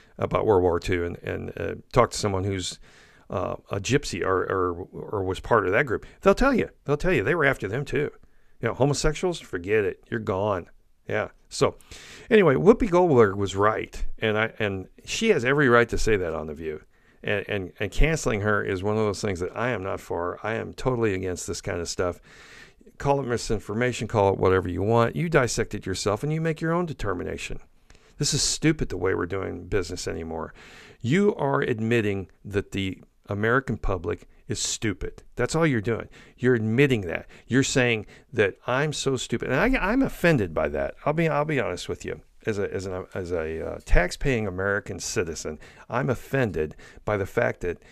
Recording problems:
none

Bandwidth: 14.5 kHz